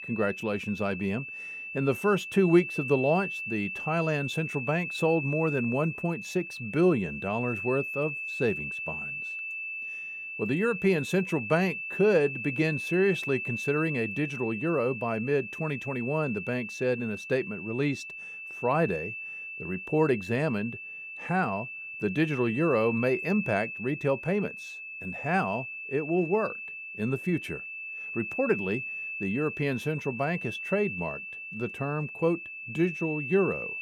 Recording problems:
high-pitched whine; loud; throughout; 2.5 kHz, 6 dB below the speech

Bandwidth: 18 kHz